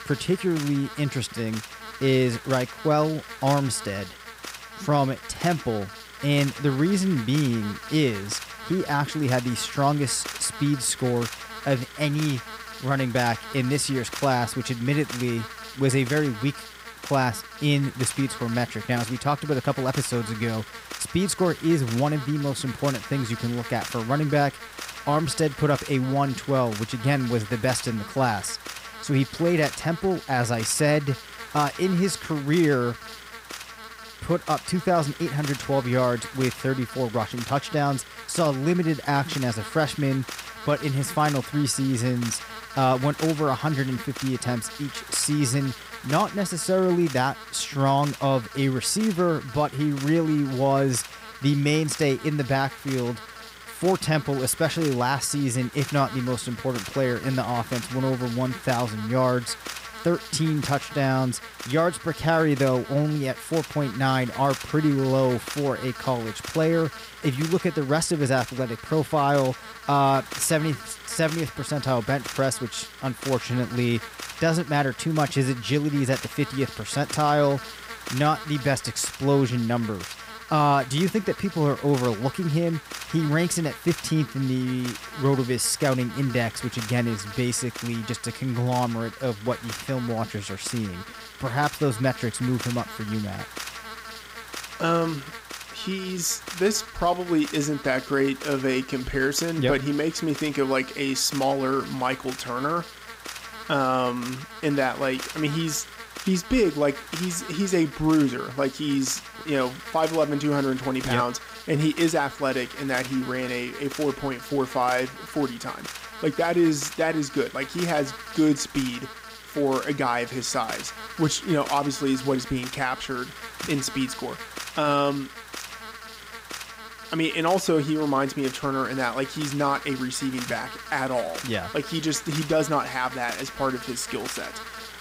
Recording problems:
electrical hum; loud; throughout; 60 Hz, 10 dB below the speech

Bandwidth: 15.5 kHz